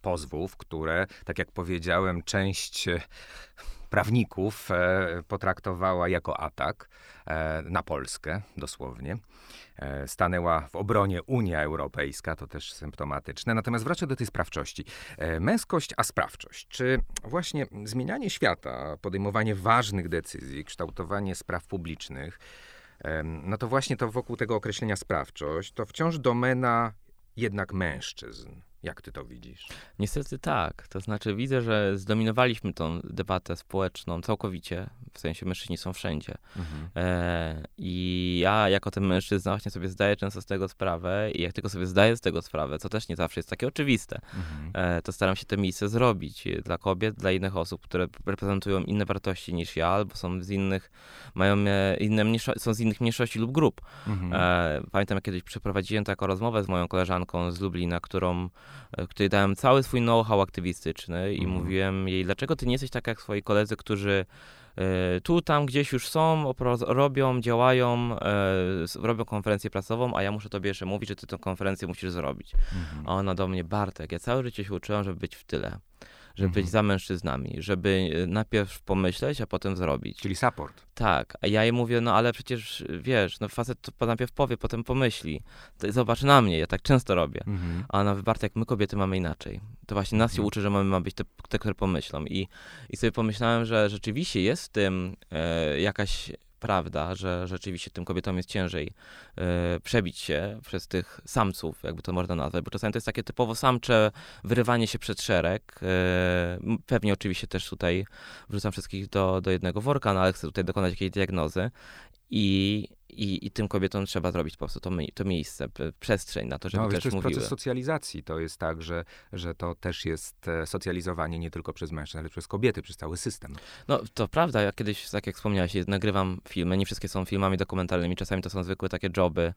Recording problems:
none

